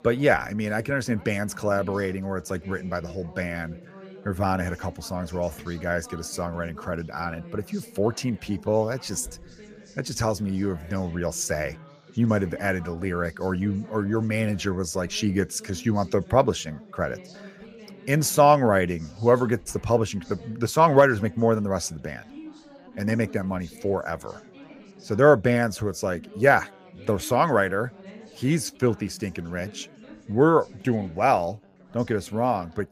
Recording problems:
background chatter; faint; throughout; 4 voices, 20 dB below the speech

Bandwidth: 15 kHz